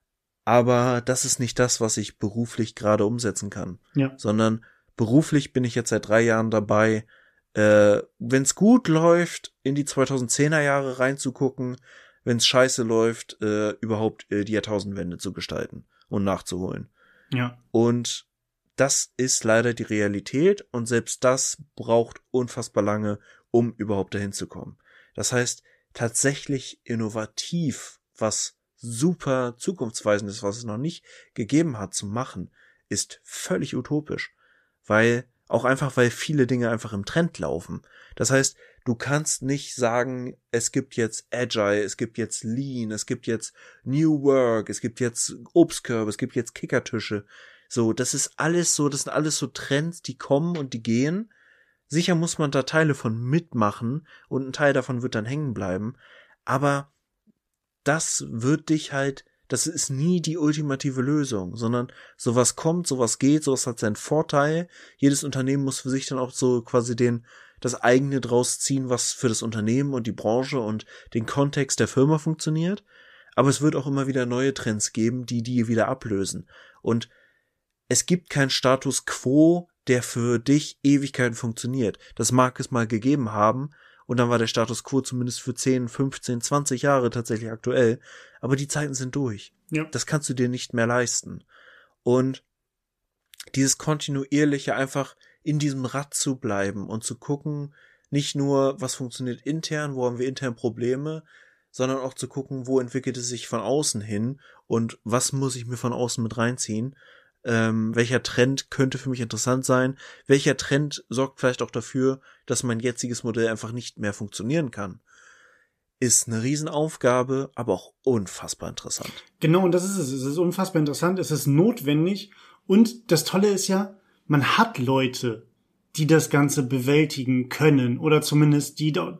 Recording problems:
none

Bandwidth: 14.5 kHz